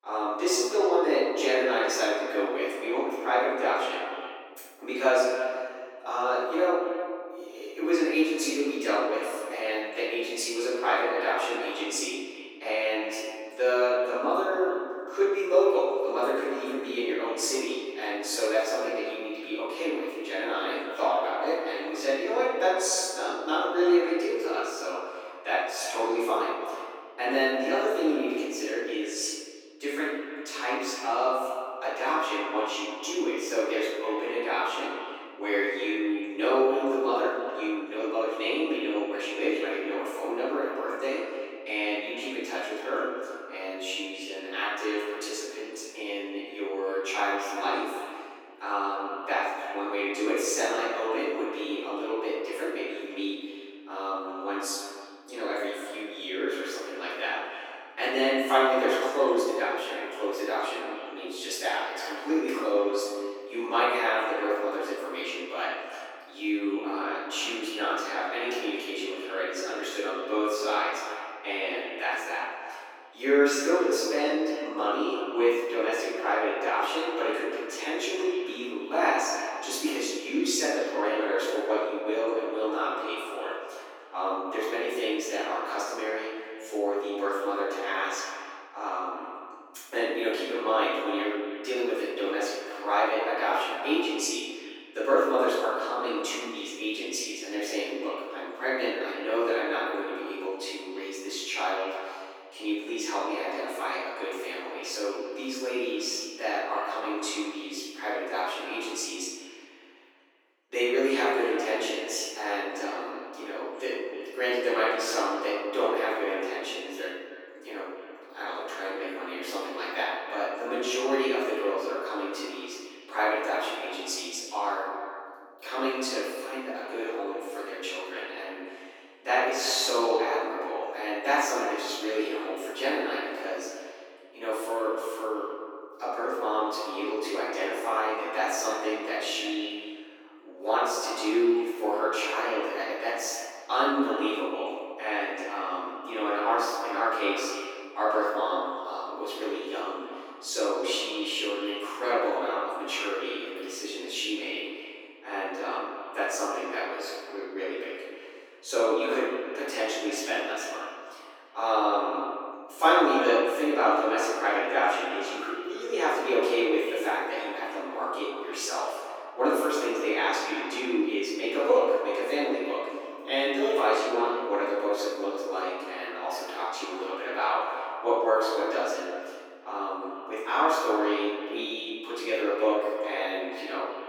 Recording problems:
echo of what is said; strong; throughout; 300 ms later, 10 dB below the speech
room echo; strong; dies away in 1.1 s
off-mic speech; far
thin; somewhat; fading below 300 Hz

